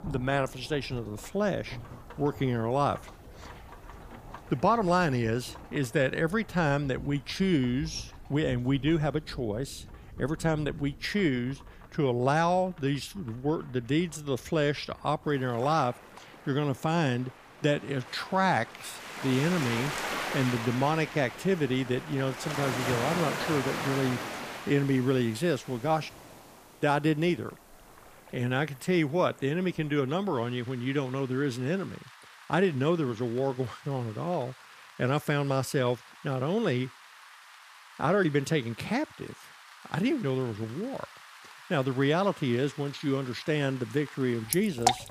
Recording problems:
rain or running water; noticeable; throughout; 10 dB below the speech

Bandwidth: 15 kHz